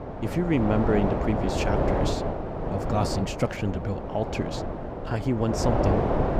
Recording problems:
wind noise on the microphone; heavy; 2 dB above the speech

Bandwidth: 15.5 kHz